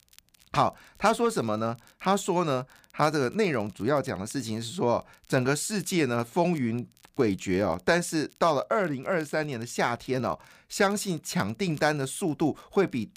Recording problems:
crackle, like an old record; faint; 30 dB below the speech

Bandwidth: 15 kHz